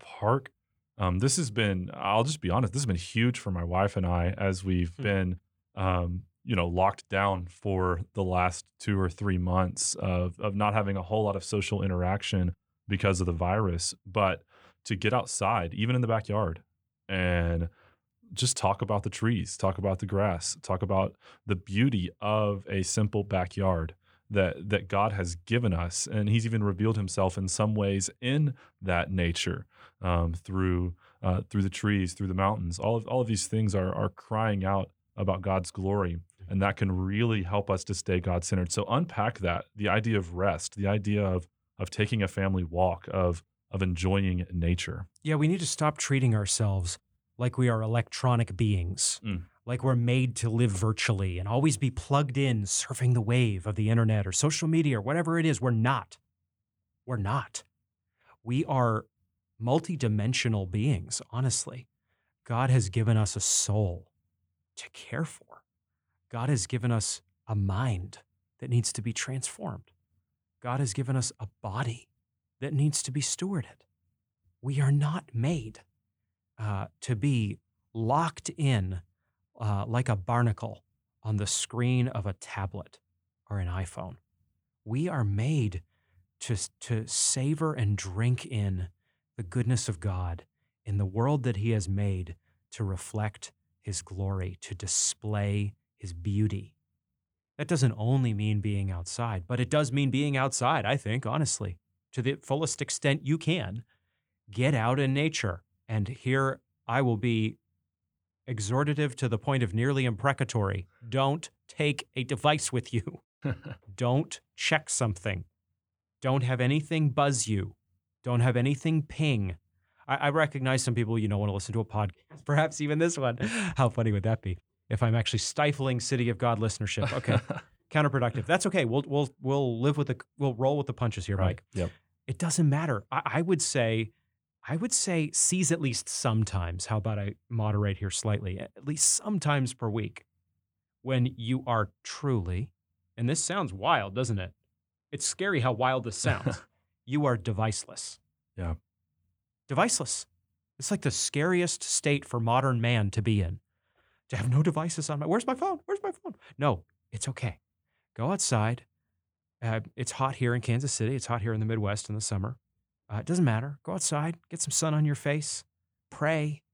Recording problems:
none

